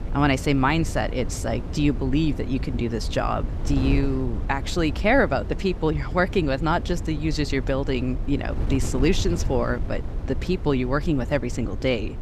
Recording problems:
wind noise on the microphone; occasional gusts; 15 dB below the speech

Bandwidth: 14.5 kHz